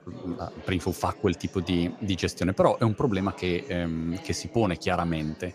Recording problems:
chatter from many people; noticeable; throughout; 20 dB below the speech

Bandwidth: 14.5 kHz